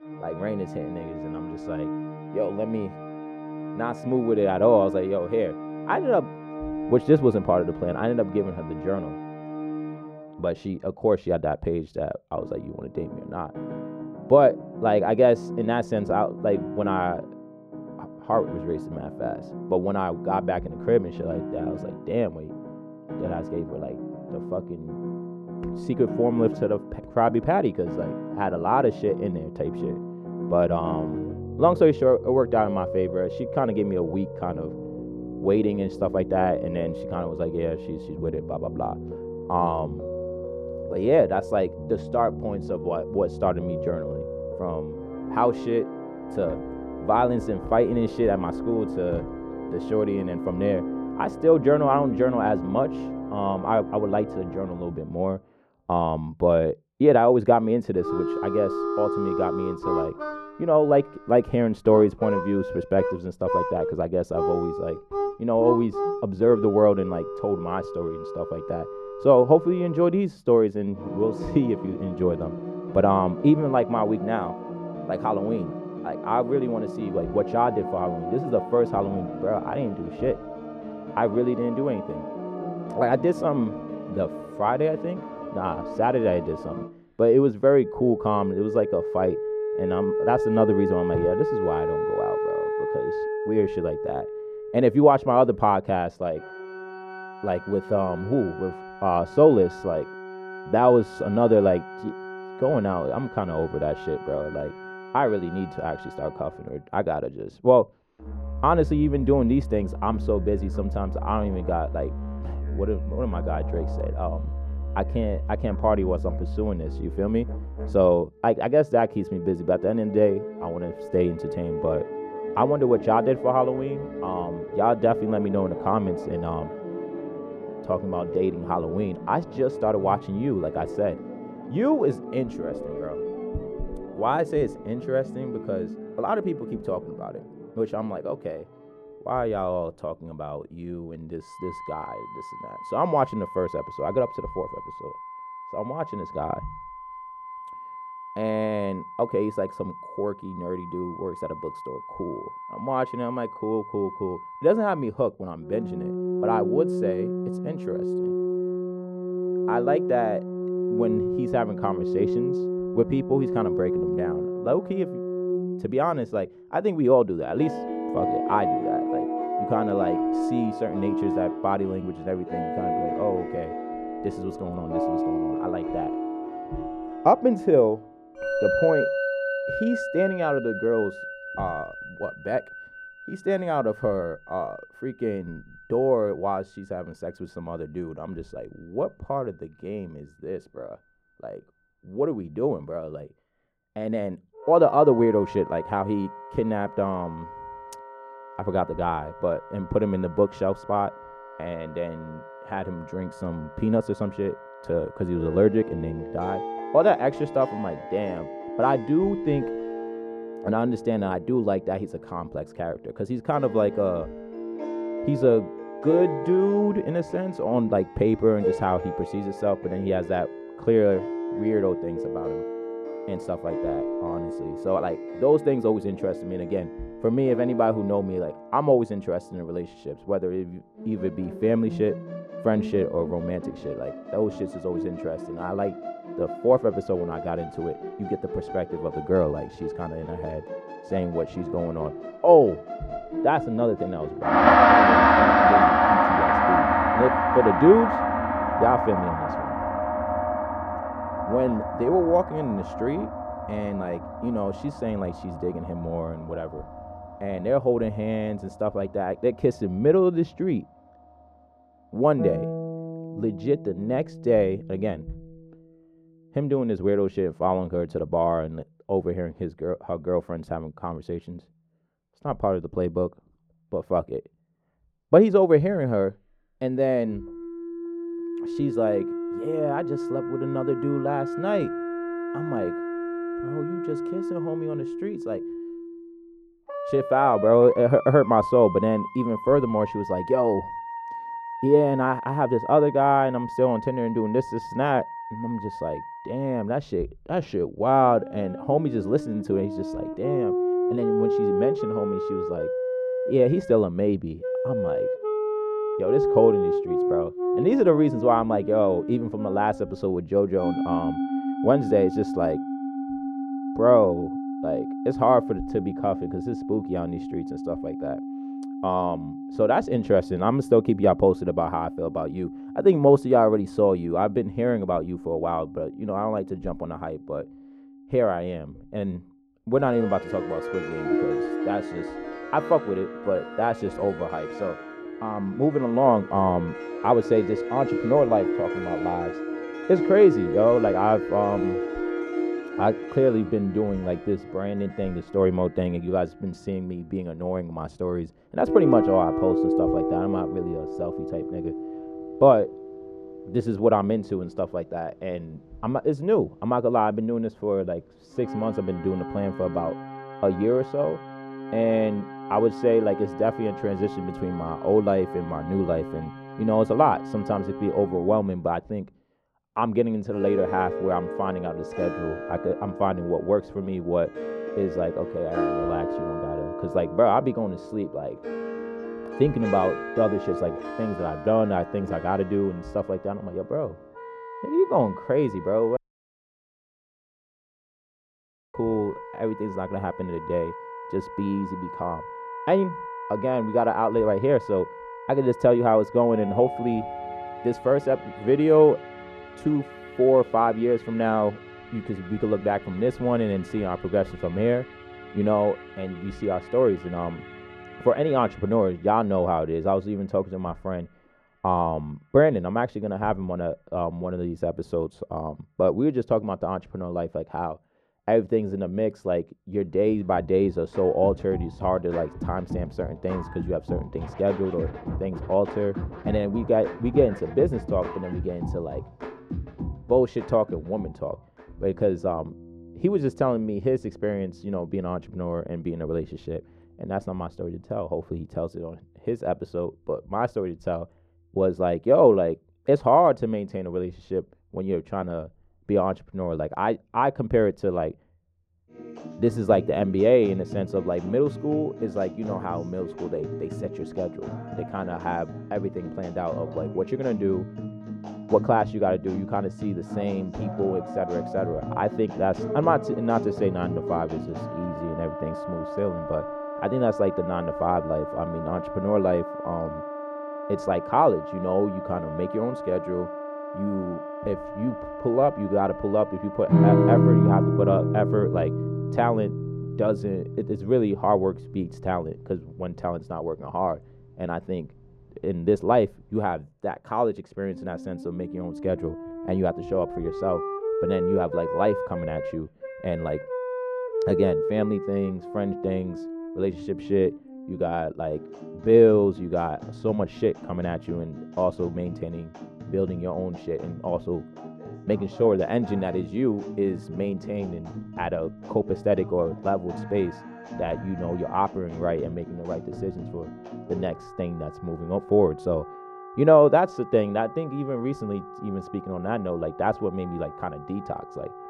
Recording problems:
muffled; very; fading above 1.5 kHz
background music; loud; throughout; 6 dB below the speech
audio cutting out; at 6:26 for 3 s

